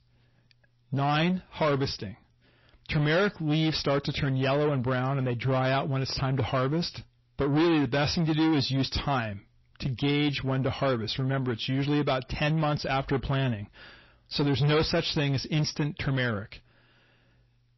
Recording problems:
distortion; heavy; 7 dB below the speech
garbled, watery; slightly; nothing above 5.5 kHz

